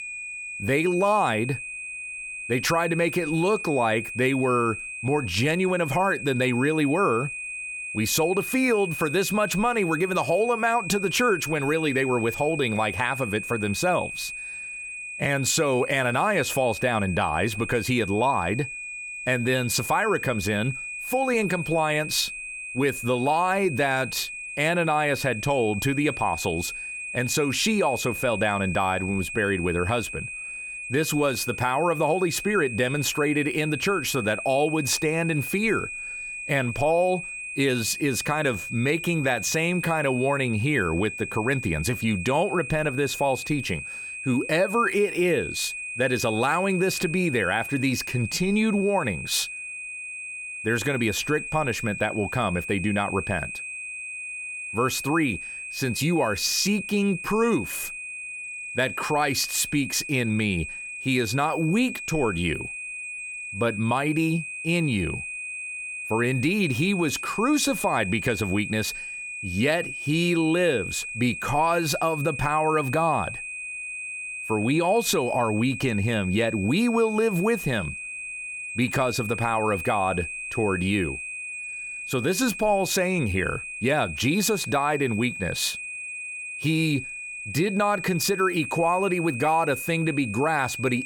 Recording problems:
high-pitched whine; loud; throughout; 2.5 kHz, 8 dB below the speech

